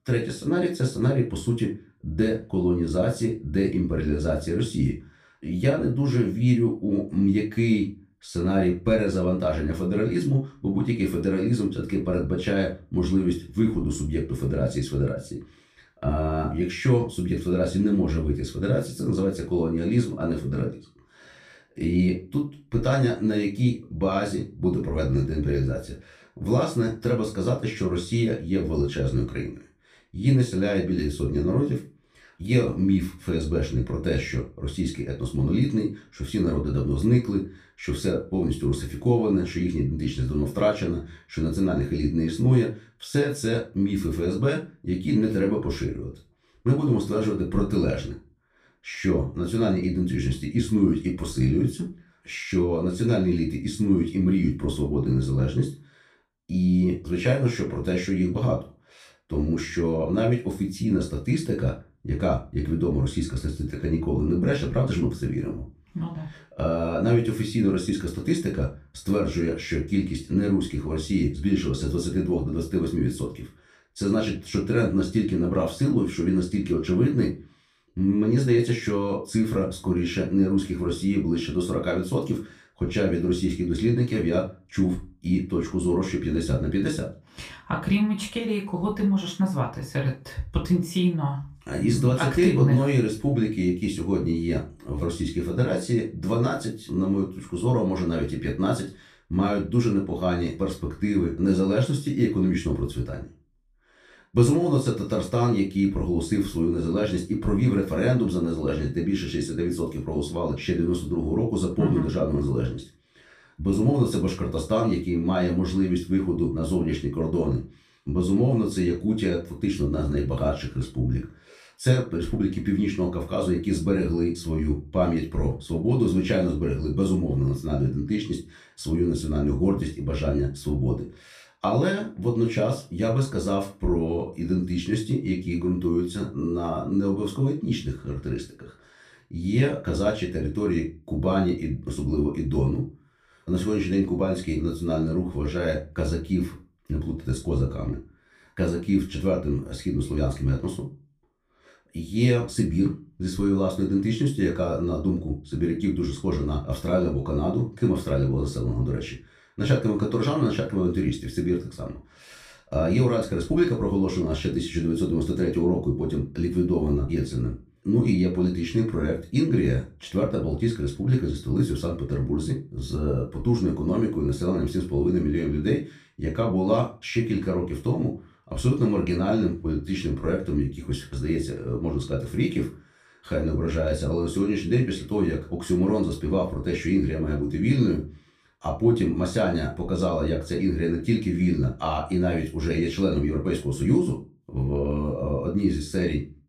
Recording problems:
off-mic speech; far
room echo; very slight; dies away in 0.3 s

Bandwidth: 14.5 kHz